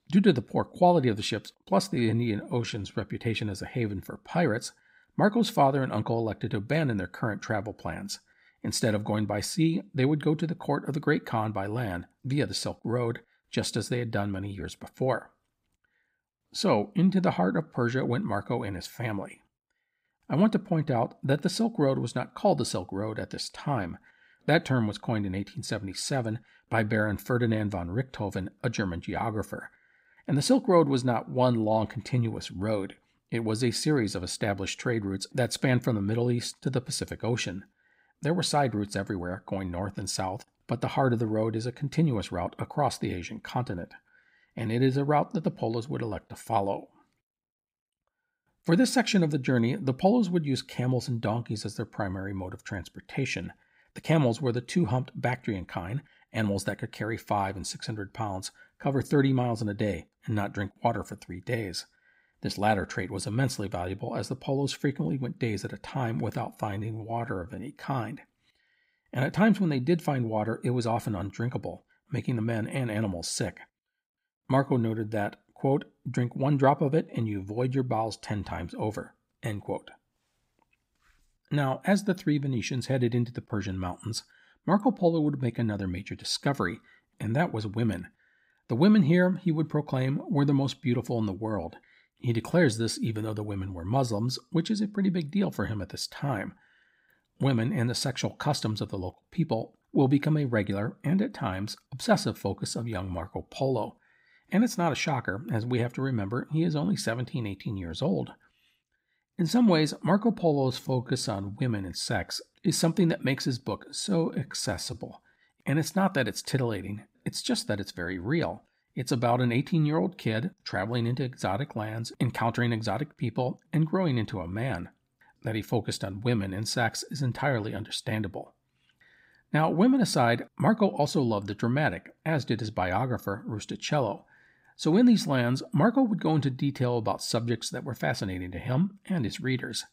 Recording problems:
uneven, jittery; strongly; from 2 s to 1:55

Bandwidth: 15.5 kHz